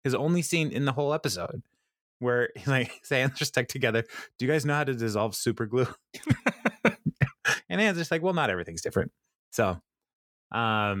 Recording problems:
abrupt cut into speech; at the end

